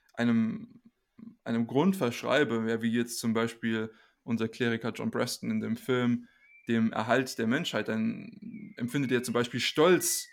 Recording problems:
animal sounds; faint; throughout; 25 dB below the speech

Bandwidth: 17 kHz